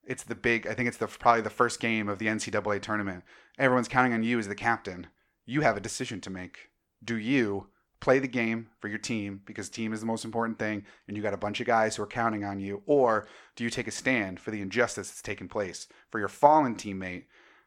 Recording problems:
none

